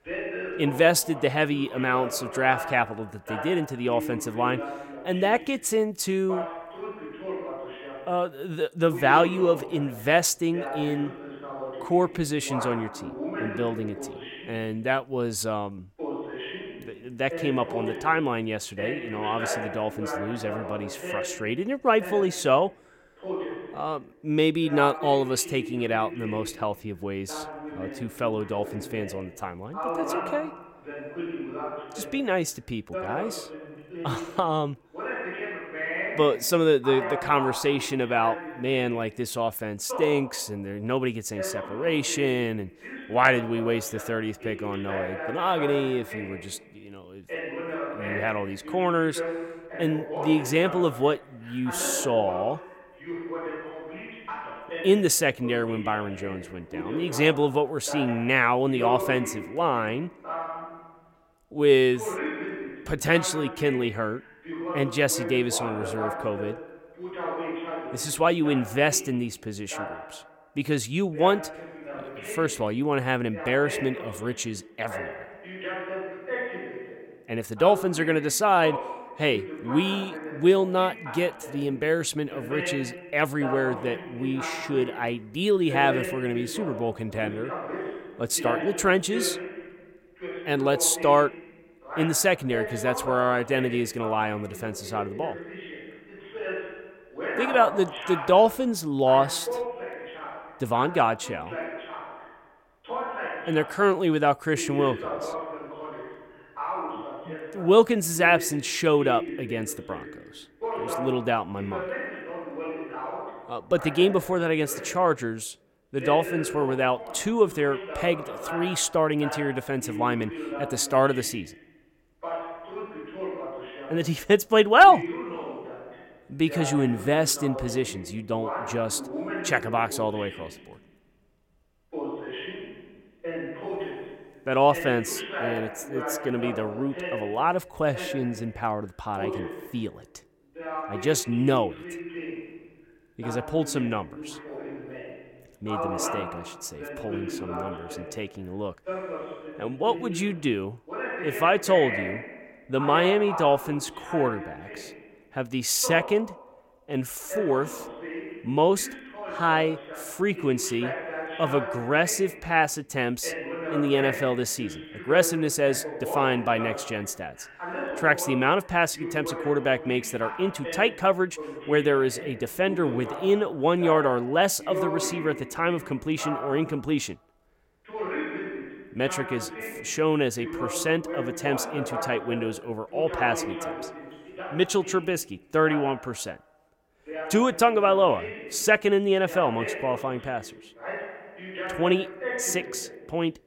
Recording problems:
voice in the background; loud; throughout; 10 dB below the speech

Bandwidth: 16.5 kHz